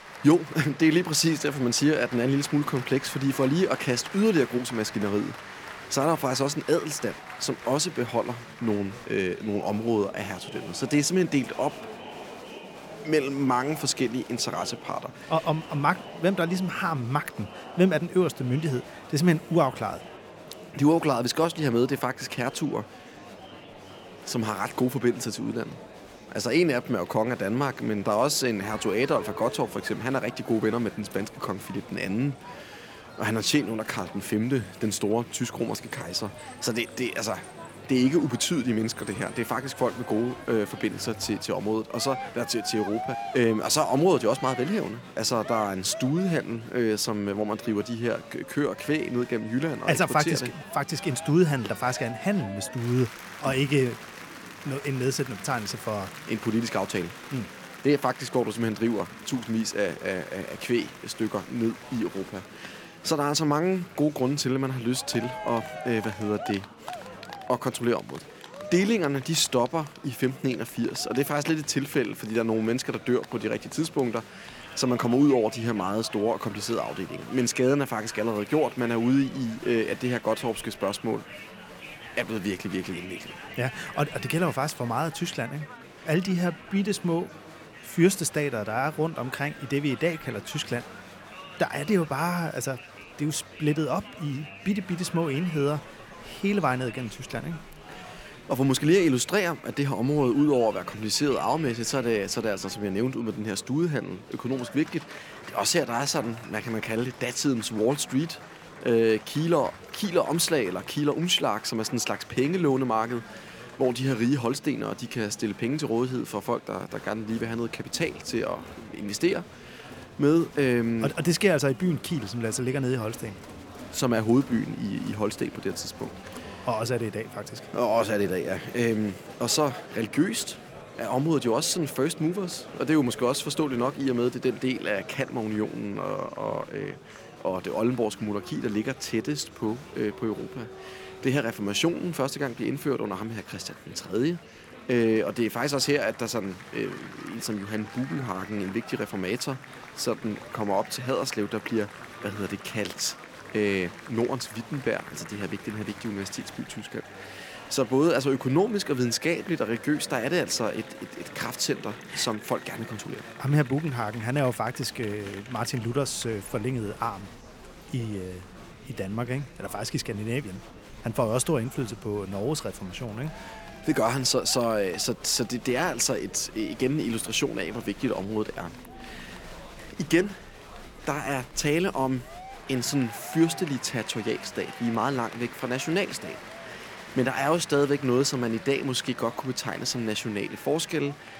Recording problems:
crowd noise; noticeable; throughout; 15 dB below the speech
chatter from many people; faint; throughout; 20 dB below the speech

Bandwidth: 17 kHz